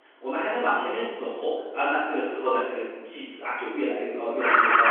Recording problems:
room echo; strong; dies away in 1.3 s
off-mic speech; far
phone-call audio
alarms or sirens; very faint; throughout; 4 dB above the speech

